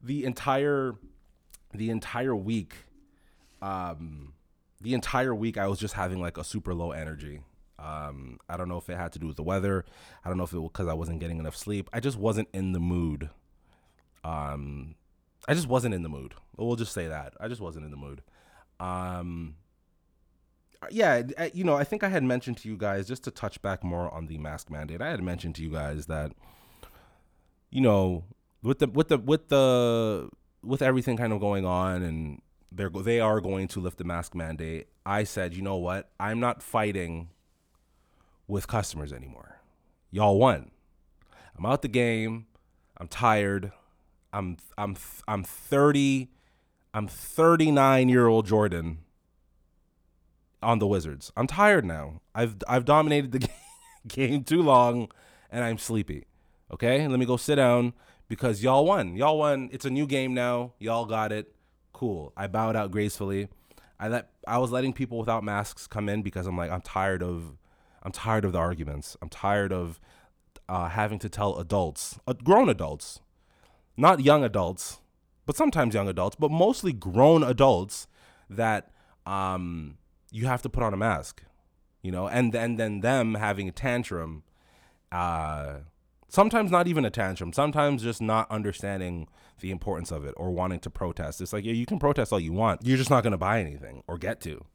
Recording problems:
none

